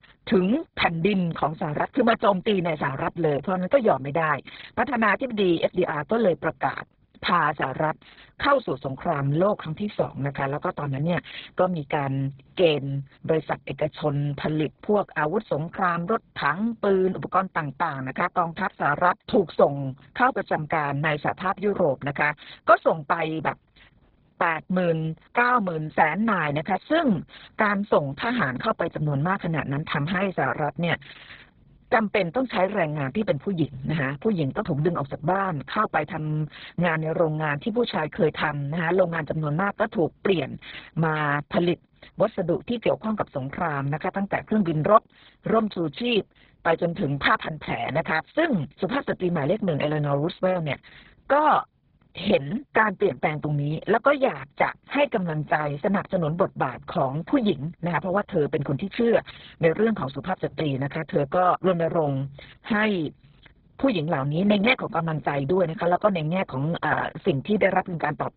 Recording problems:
garbled, watery; badly; nothing above 4 kHz

